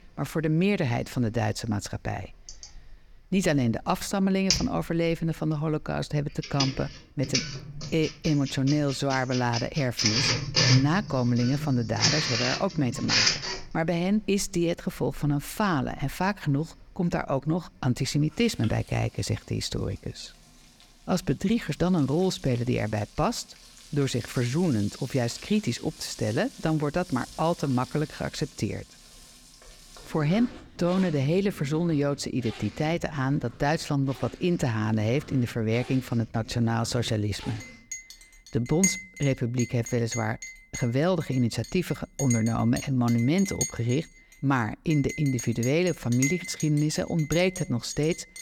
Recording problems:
household noises; loud; throughout; 4 dB below the speech

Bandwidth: 18 kHz